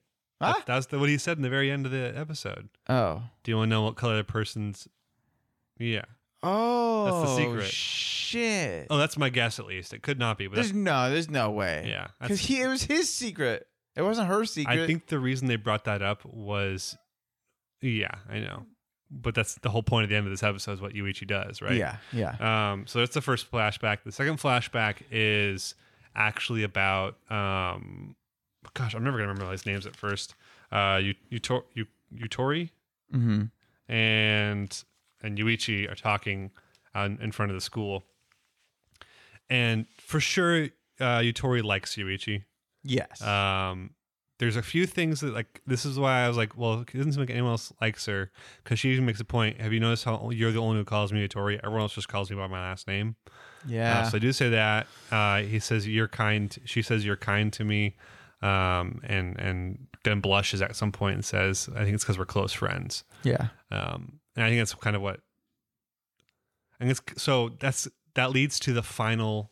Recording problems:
none

